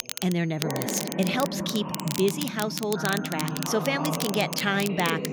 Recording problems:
voice in the background; loud; throughout; 5 dB below the speech
crackle, like an old record; loud; 7 dB below the speech
high-pitched whine; faint; until 1 s and from 2.5 to 4.5 s; 6.5 kHz, 30 dB below the speech

